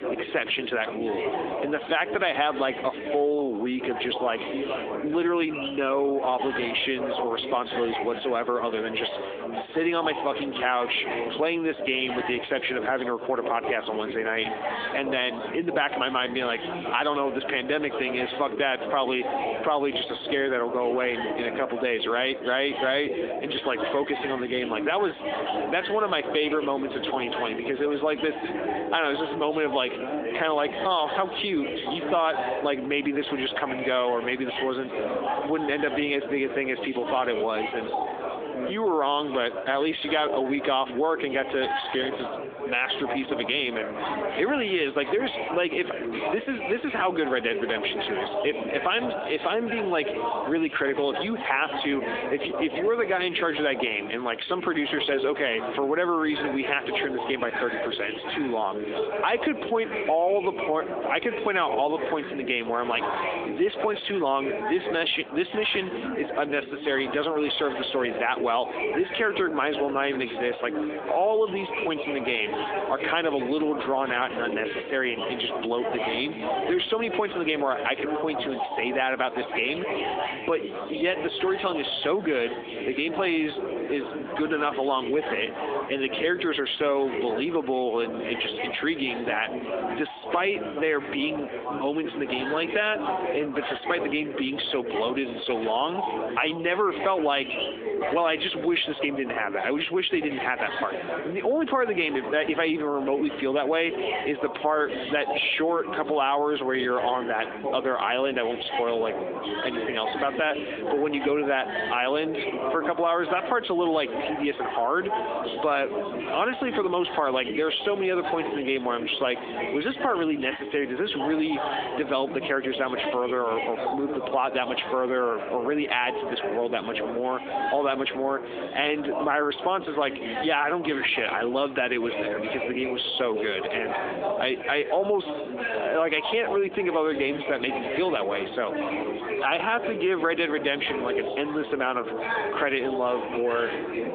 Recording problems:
squashed, flat; heavily, background pumping
phone-call audio; nothing above 3.5 kHz
chatter from many people; loud; throughout; 6 dB below the speech

